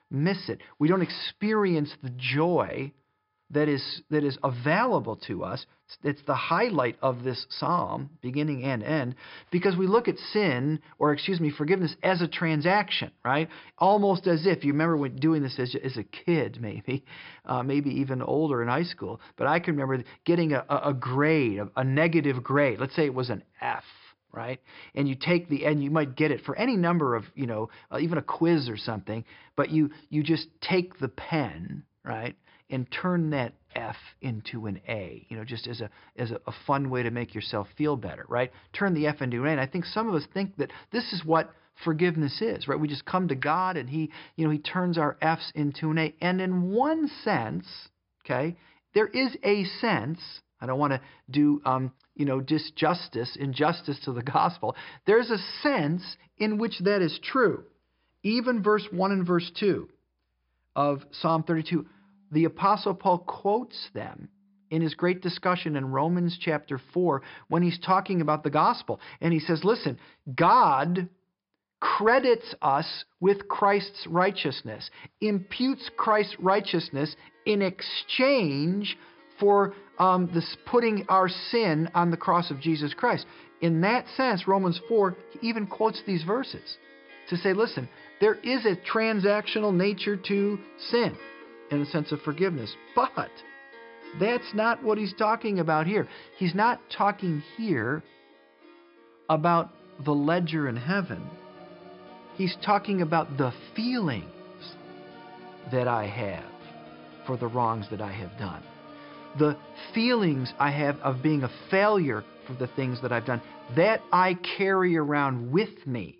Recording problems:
high frequencies cut off; noticeable; nothing above 5.5 kHz
background music; faint; throughout; 20 dB below the speech

